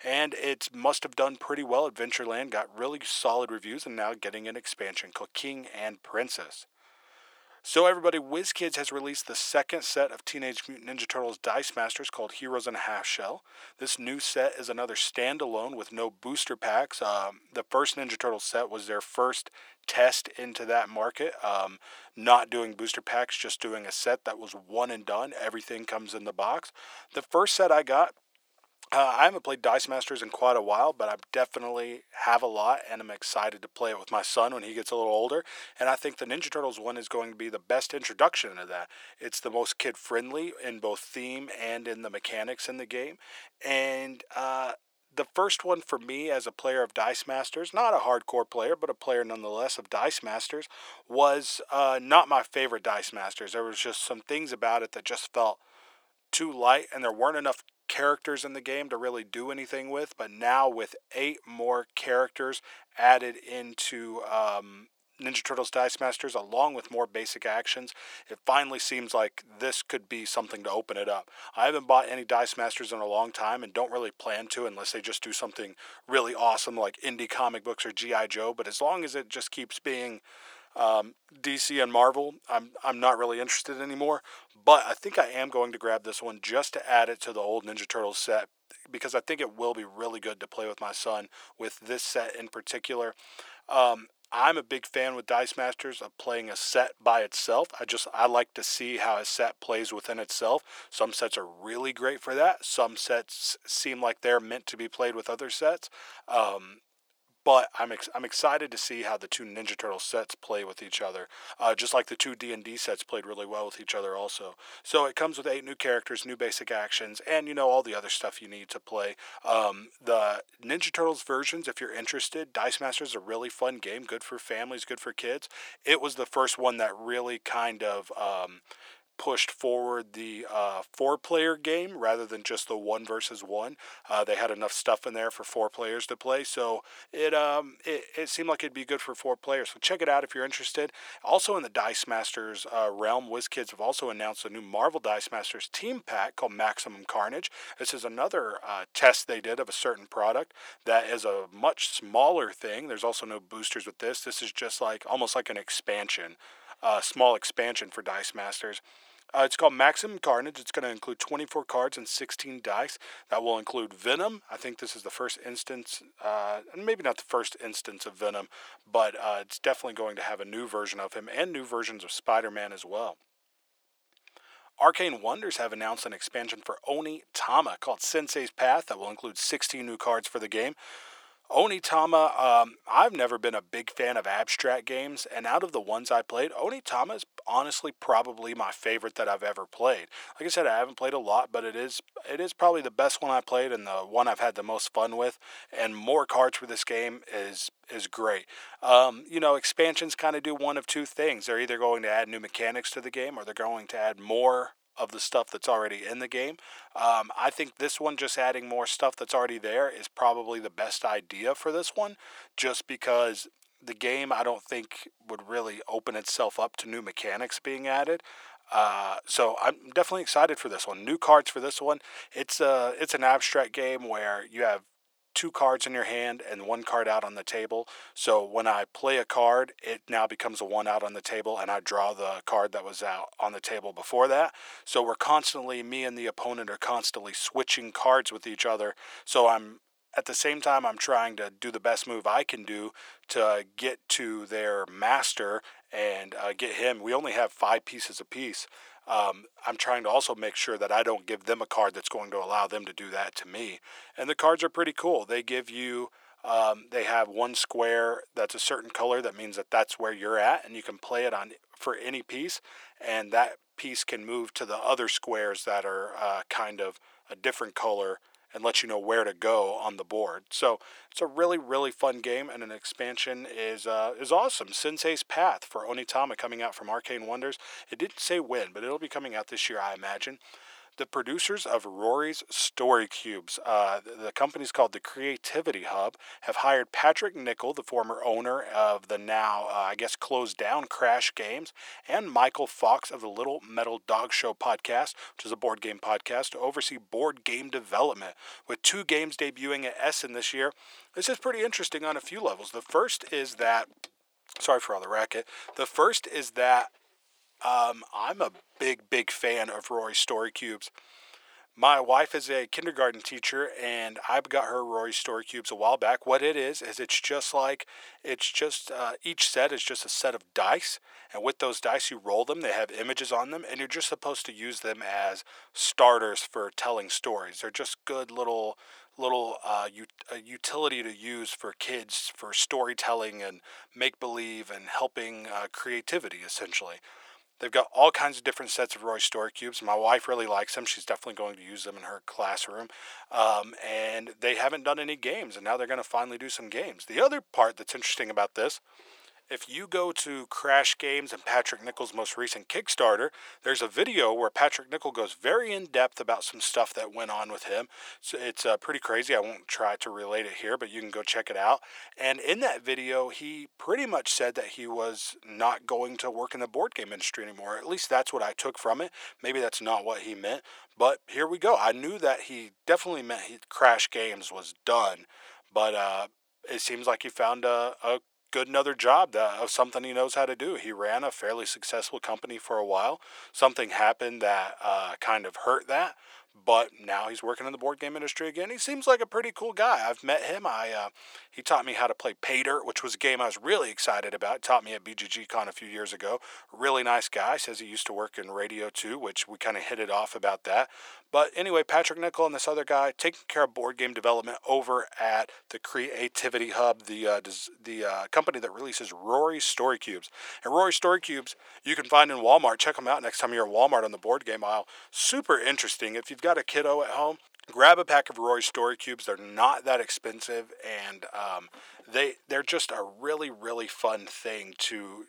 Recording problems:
thin; very; fading below 550 Hz

